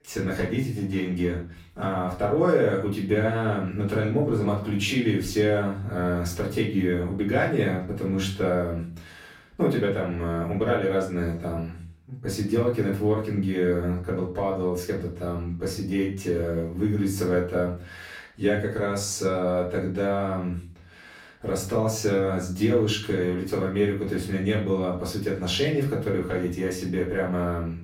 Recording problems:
off-mic speech; far
room echo; slight; dies away in 0.4 s

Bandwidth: 16 kHz